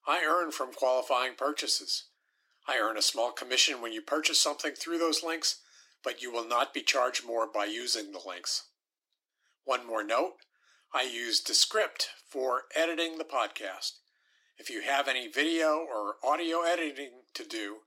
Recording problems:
thin; very; fading below 300 Hz

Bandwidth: 16.5 kHz